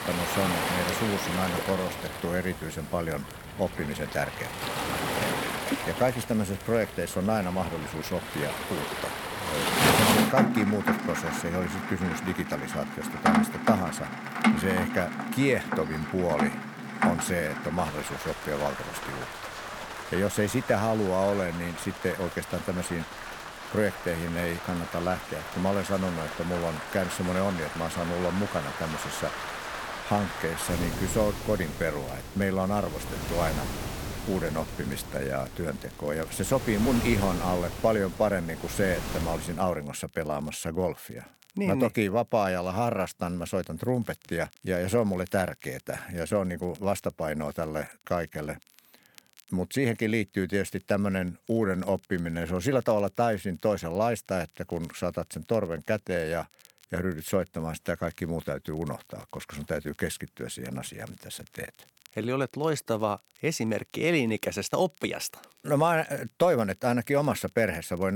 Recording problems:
rain or running water; loud; until 39 s; 2 dB below the speech
crackle, like an old record; faint; 25 dB below the speech
abrupt cut into speech; at the end

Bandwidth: 18 kHz